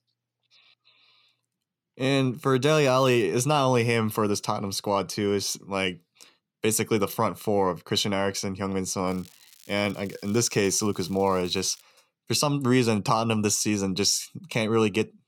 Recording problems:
crackling; faint; at 2.5 s and from 9 to 12 s; 25 dB below the speech

